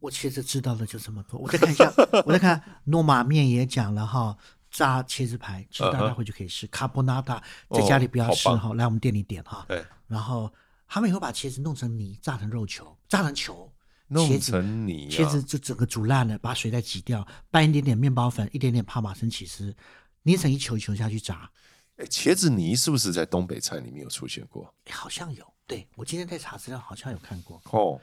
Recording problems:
none

